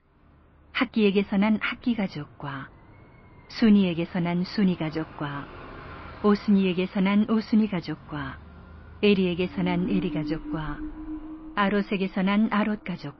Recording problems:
muffled; slightly; fading above 3 kHz
garbled, watery; slightly; nothing above 5.5 kHz
high frequencies cut off; slight
traffic noise; noticeable; throughout; 15 dB below the speech

